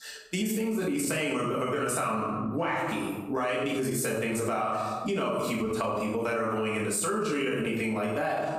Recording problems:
off-mic speech; far
room echo; noticeable; dies away in 0.7 s
squashed, flat; somewhat

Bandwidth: 15 kHz